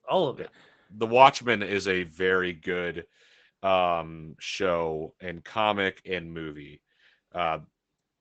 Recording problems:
garbled, watery; badly; nothing above 7.5 kHz

